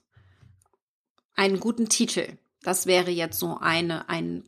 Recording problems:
none

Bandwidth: 14.5 kHz